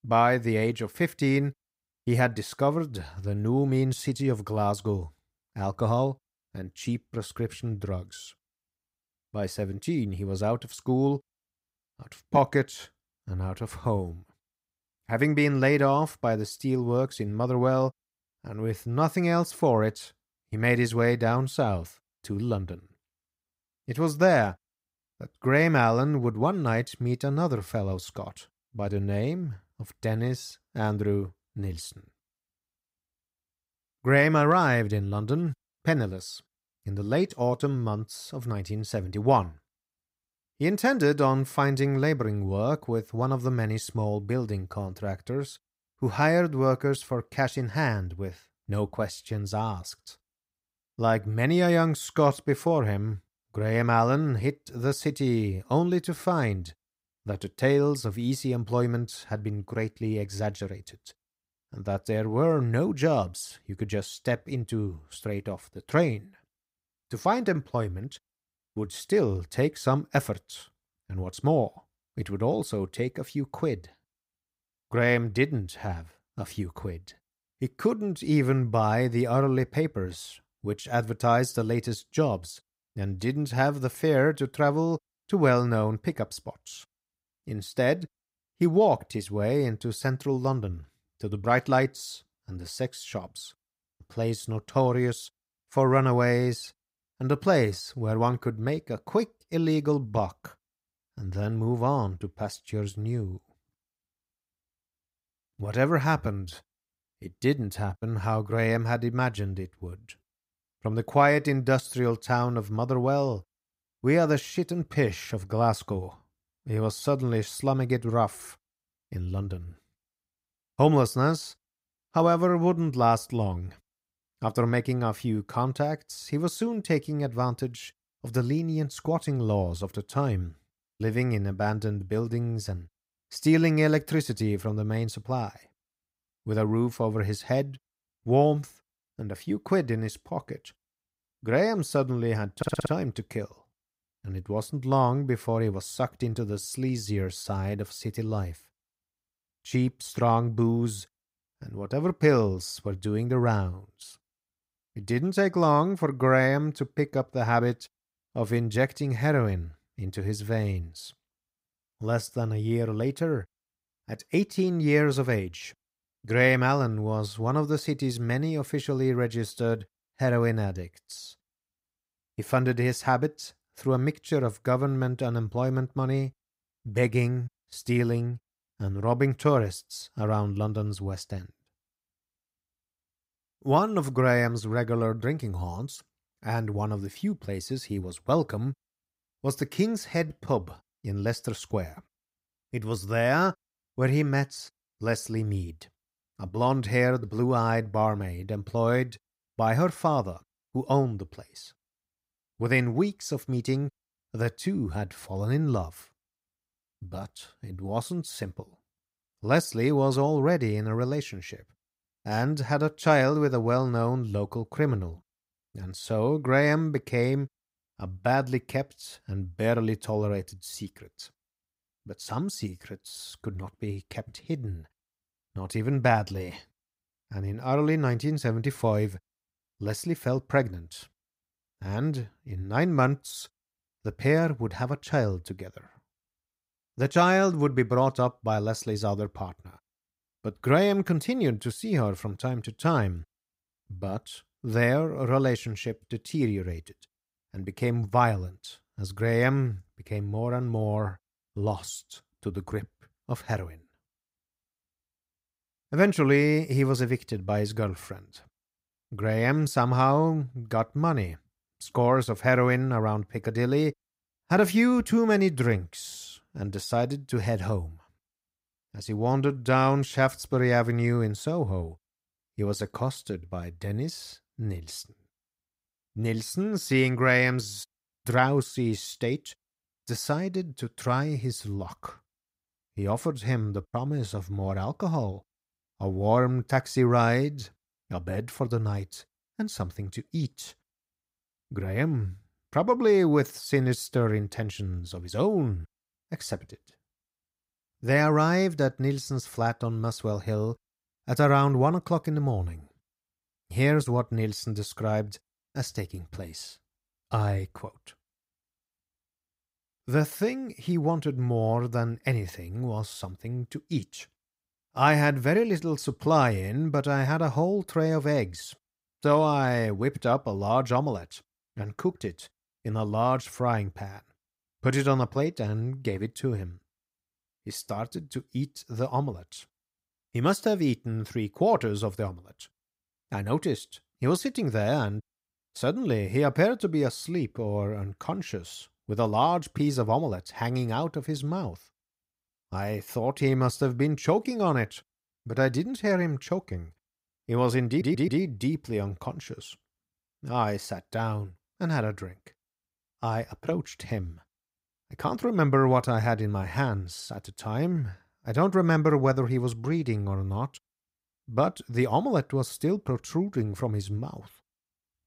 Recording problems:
audio stuttering; at 2:23 and at 5:48

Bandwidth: 15.5 kHz